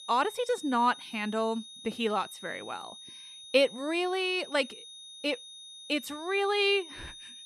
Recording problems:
high-pitched whine; noticeable; throughout; 3.5 kHz, 15 dB below the speech

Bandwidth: 14.5 kHz